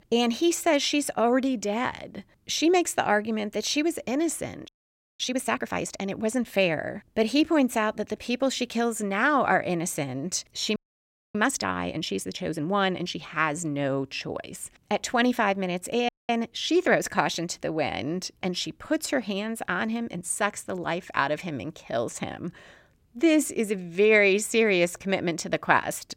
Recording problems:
audio freezing; at 4.5 s for 0.5 s, at 11 s for 0.5 s and at 16 s

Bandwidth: 16 kHz